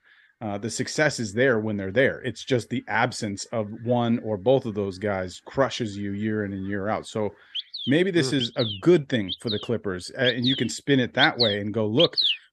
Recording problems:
animal sounds; loud; throughout; 2 dB below the speech

